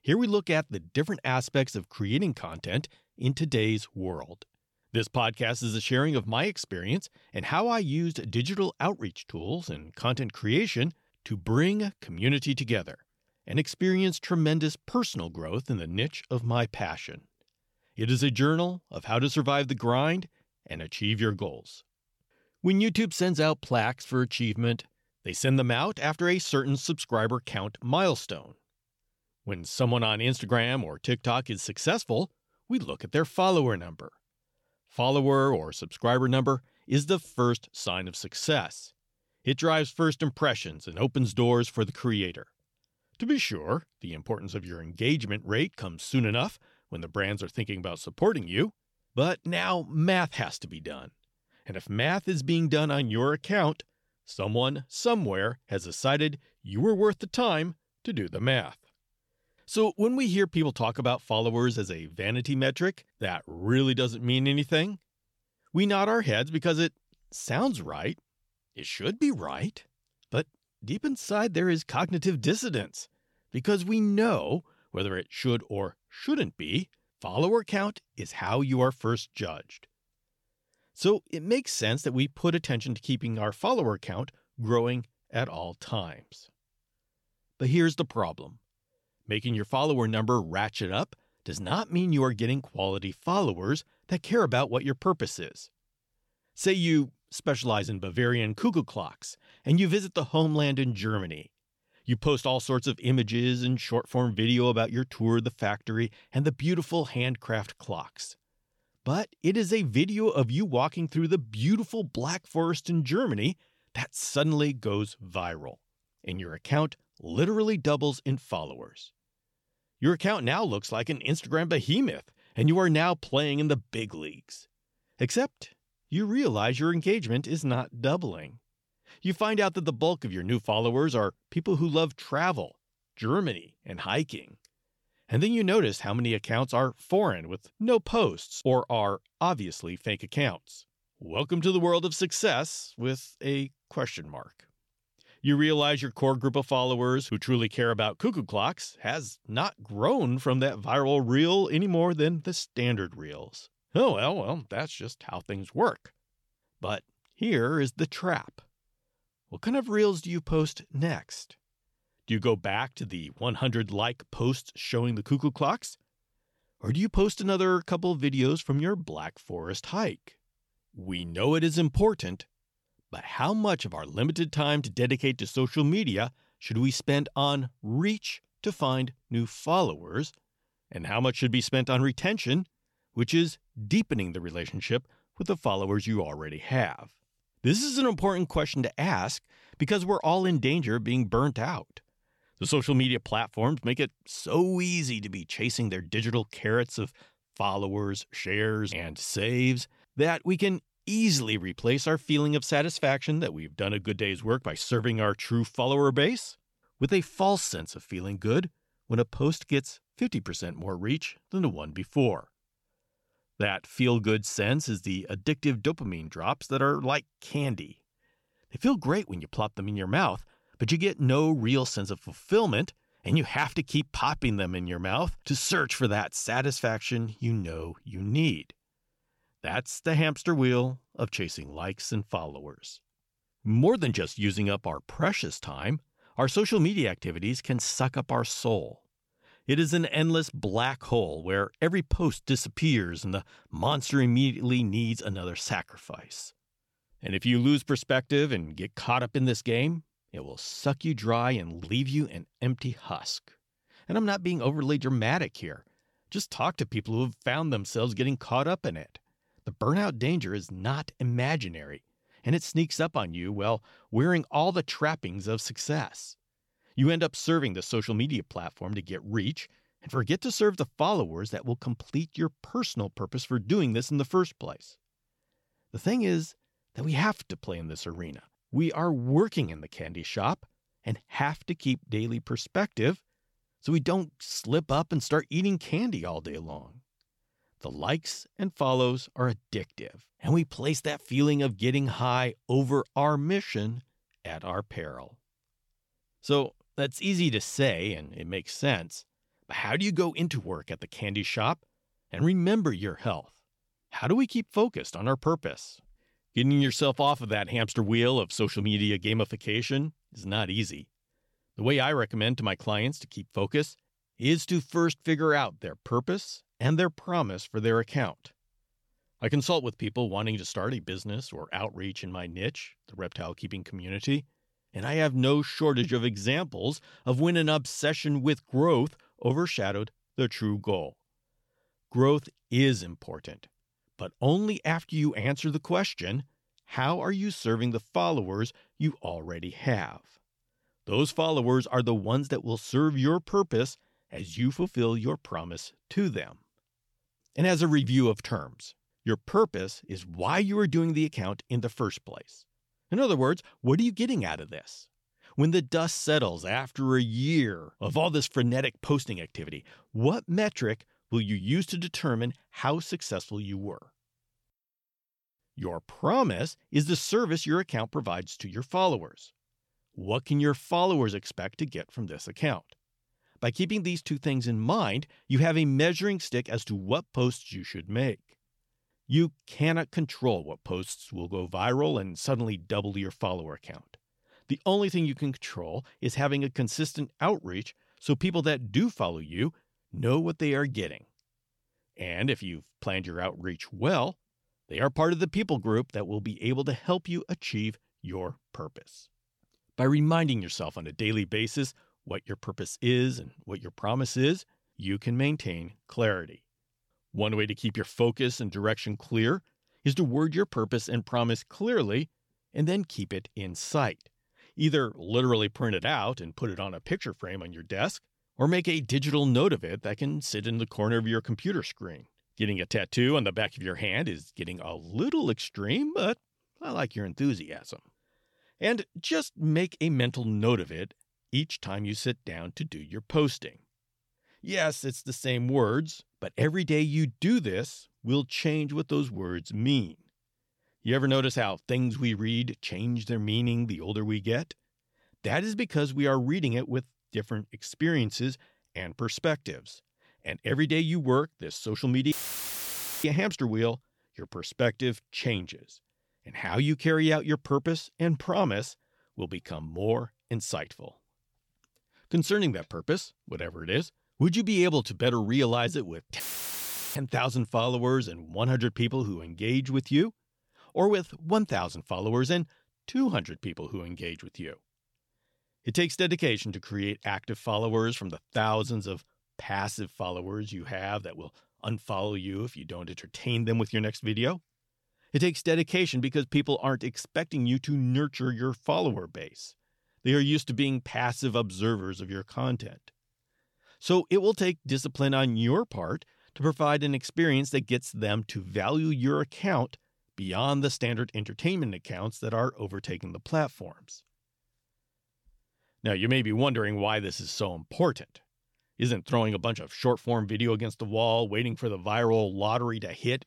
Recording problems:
audio cutting out; filled with static; at 7:32 for 1 s and at 7:46 for 1 s

